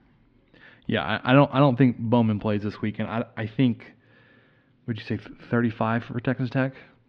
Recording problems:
muffled; slightly; fading above 3.5 kHz

